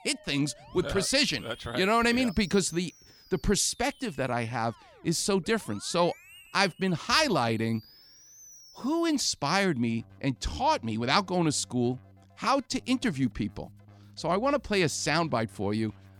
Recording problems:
background music; faint; throughout; 25 dB below the speech

